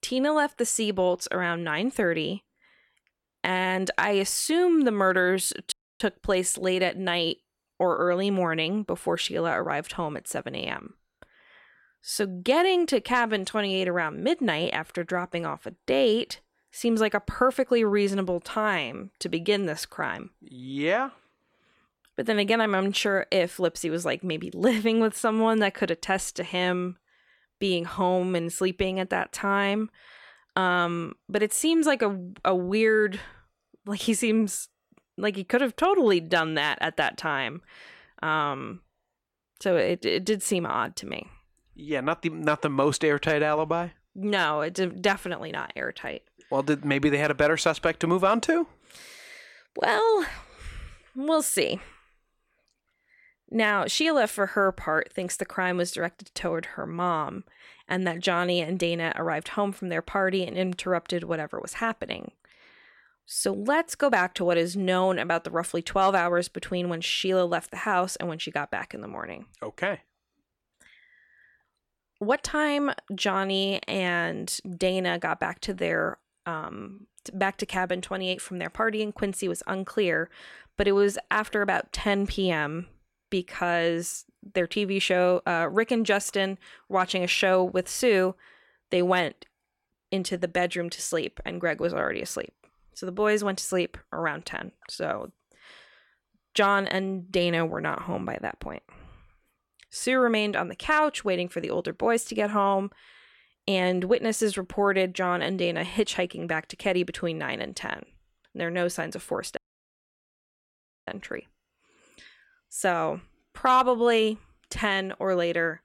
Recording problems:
audio cutting out; at 5.5 s and at 1:50 for 1.5 s

